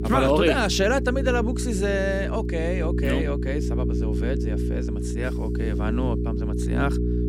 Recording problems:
electrical hum; loud; throughout; 60 Hz, 8 dB below the speech

